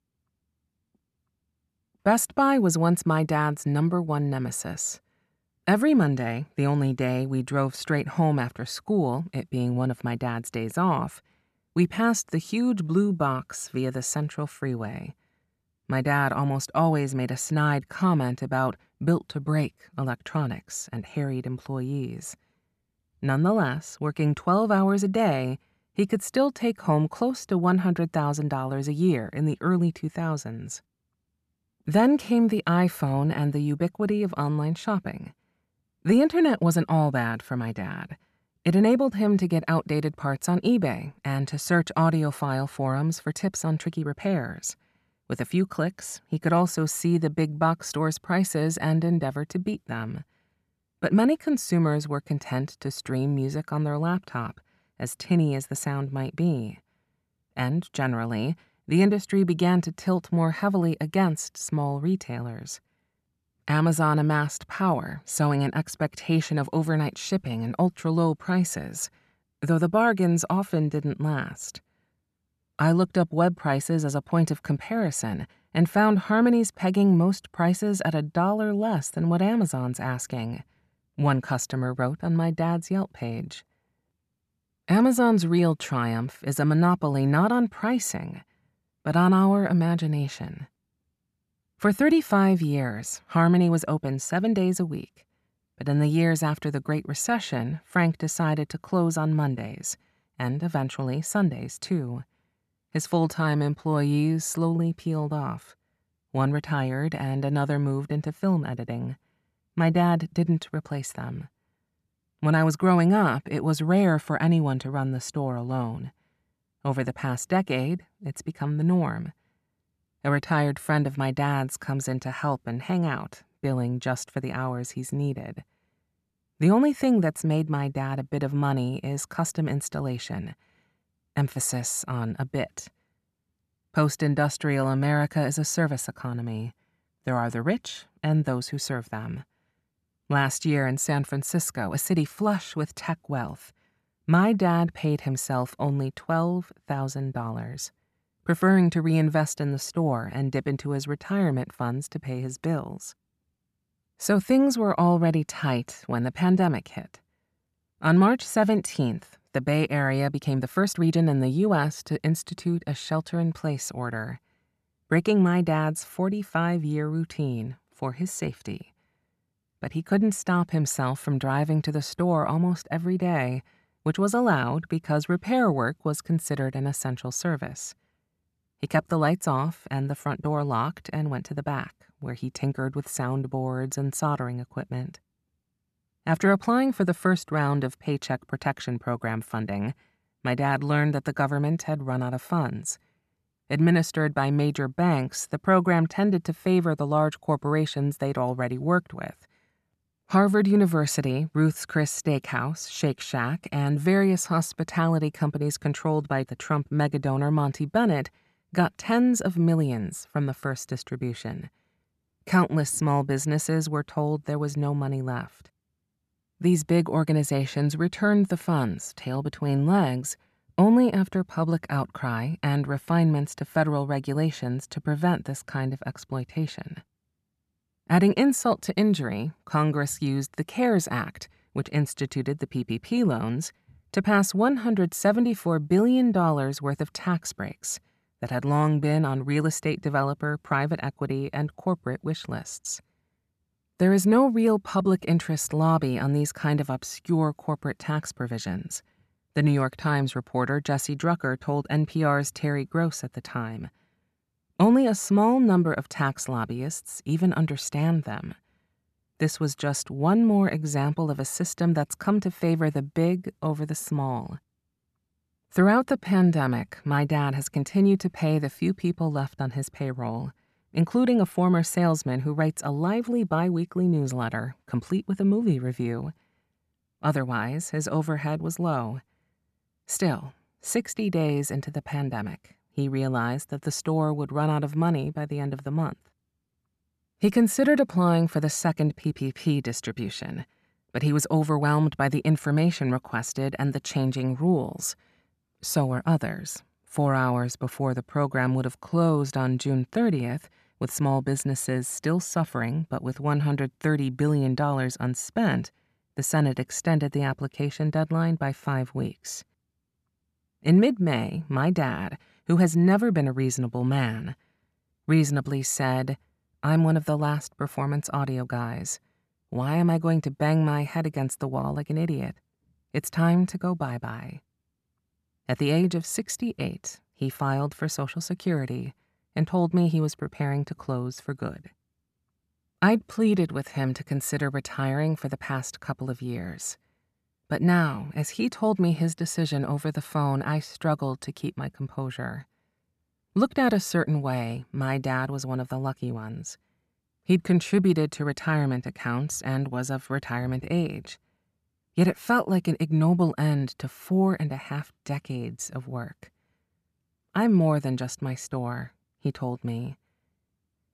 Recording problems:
uneven, jittery; strongly; from 43 s to 4:59

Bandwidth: 14 kHz